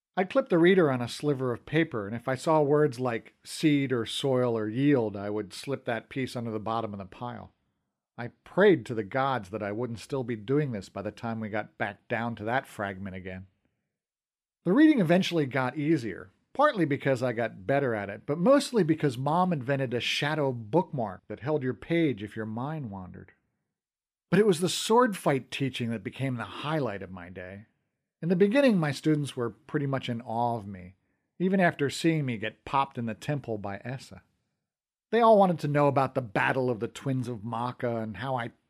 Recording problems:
none

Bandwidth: 15 kHz